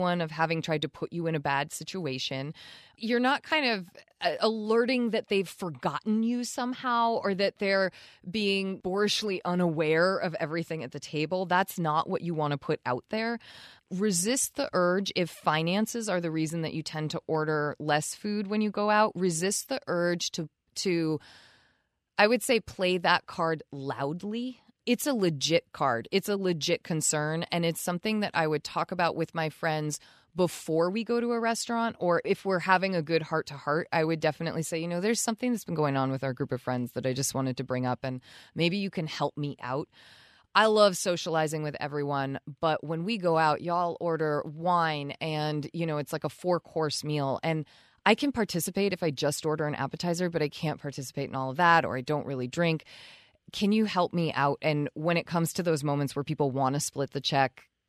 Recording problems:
abrupt cut into speech; at the start

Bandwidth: 14 kHz